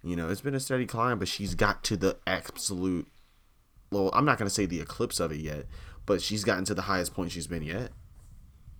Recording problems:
household noises; faint; throughout; 25 dB below the speech

